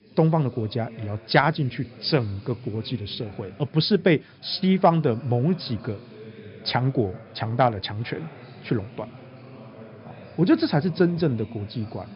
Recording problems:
high frequencies cut off; noticeable; nothing above 5.5 kHz
background chatter; noticeable; throughout; 3 voices, 20 dB below the speech
hiss; very faint; throughout; 45 dB below the speech

